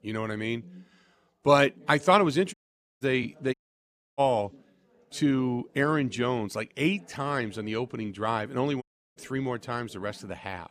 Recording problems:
background chatter; faint; throughout; 4 voices, 25 dB below the speech
audio cutting out; at 2.5 s, at 3.5 s for 0.5 s and at 9 s

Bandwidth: 14.5 kHz